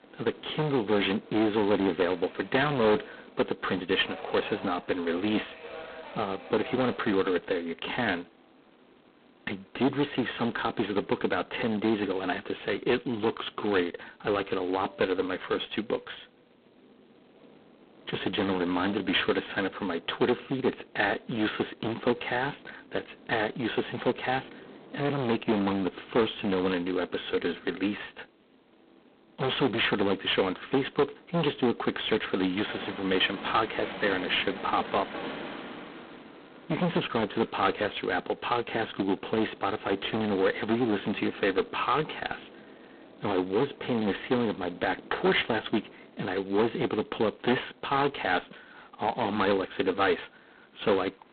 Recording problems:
phone-call audio; poor line; nothing above 3.5 kHz
distortion; heavy; 8% of the sound clipped
train or aircraft noise; noticeable; throughout; 20 dB below the speech

